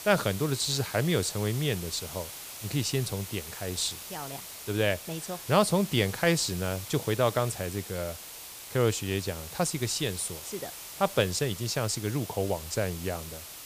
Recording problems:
hiss; noticeable; throughout; 10 dB below the speech

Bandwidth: 15 kHz